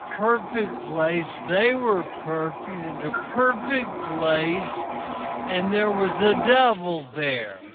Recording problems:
phone-call audio; poor line; nothing above 3.5 kHz
wrong speed, natural pitch; too slow; 0.5 times normal speed
household noises; loud; throughout; 8 dB below the speech
background chatter; faint; throughout; 4 voices, 25 dB below the speech

